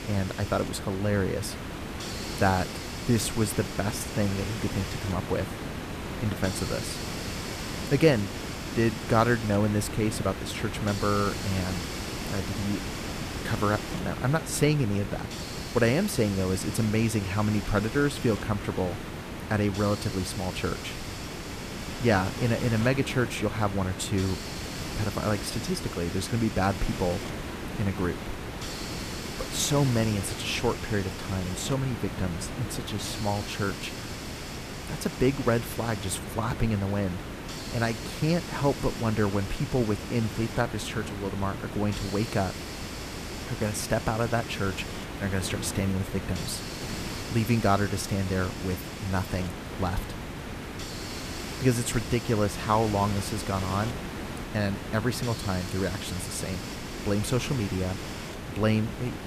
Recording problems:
hiss; loud; throughout; 7 dB below the speech

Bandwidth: 14.5 kHz